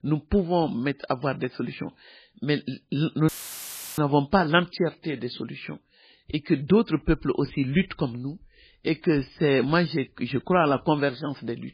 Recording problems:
garbled, watery; badly; nothing above 4.5 kHz
audio cutting out; filled with static; at 3.5 s for 0.5 s

